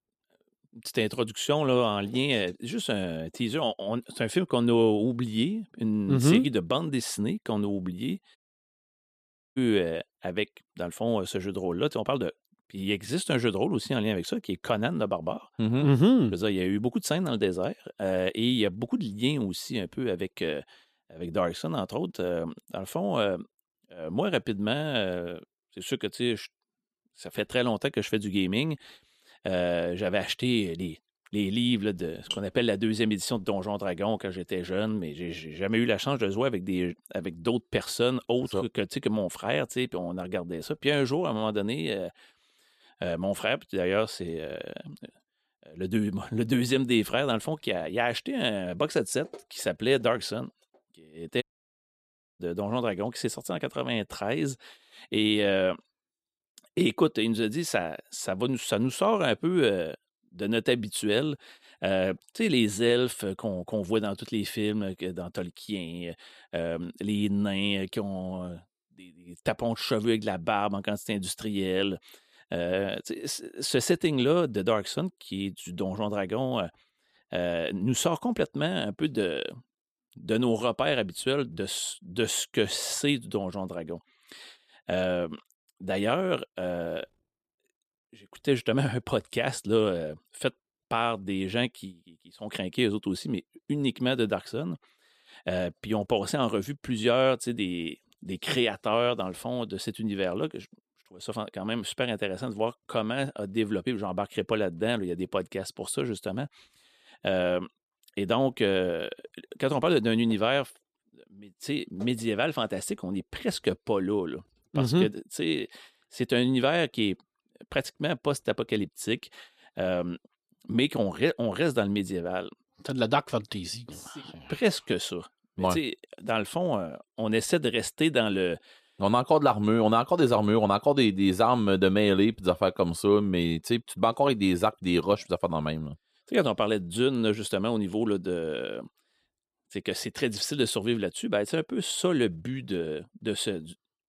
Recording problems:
audio cutting out; at 8.5 s for 1 s and at 51 s for 1 s

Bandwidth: 14.5 kHz